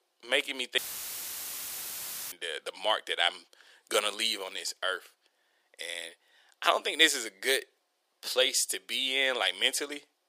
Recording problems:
thin; very; fading below 450 Hz
audio cutting out; filled with static; at 1 s for 1.5 s

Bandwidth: 15 kHz